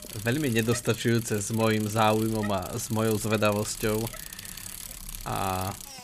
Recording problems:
traffic noise; noticeable; throughout; 10 dB below the speech

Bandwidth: 15 kHz